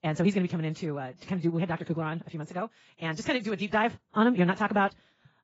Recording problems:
garbled, watery; badly; nothing above 7.5 kHz
wrong speed, natural pitch; too fast; 1.6 times normal speed

